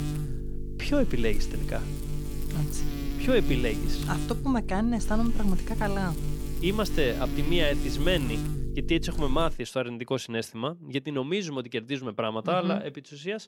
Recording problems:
electrical hum; loud; until 9.5 s; 50 Hz, 10 dB below the speech

